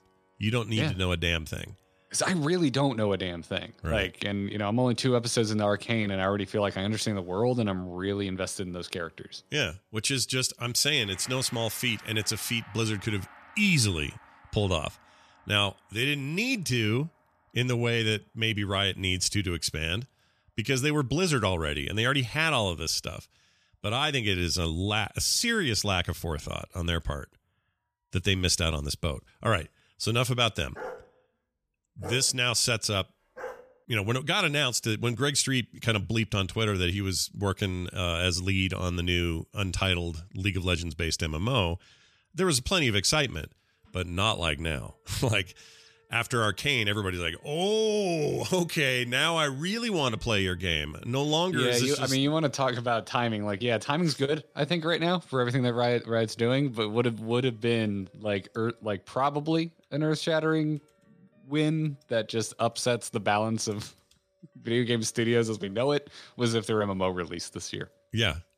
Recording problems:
background music; faint; throughout; 30 dB below the speech
dog barking; faint; from 31 to 34 s; peak 15 dB below the speech

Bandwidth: 14.5 kHz